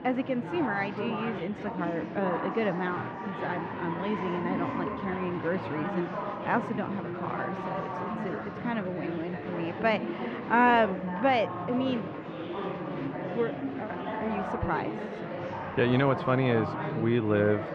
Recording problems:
muffled; very; fading above 2.5 kHz
murmuring crowd; loud; throughout; 5 dB below the speech

